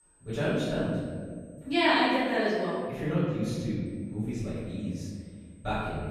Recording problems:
room echo; strong; dies away in 1.8 s
off-mic speech; far
high-pitched whine; faint; until 3 s and from 4 s on; 8 kHz, 35 dB below the speech
abrupt cut into speech; at the end

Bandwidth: 14.5 kHz